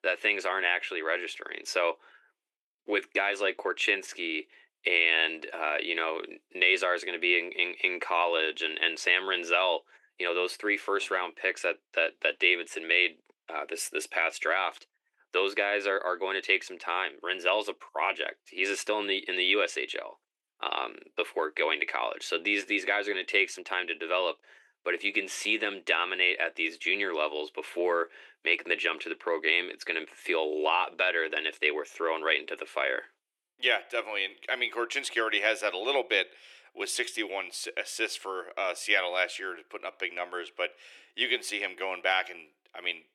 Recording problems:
thin; very; fading below 350 Hz

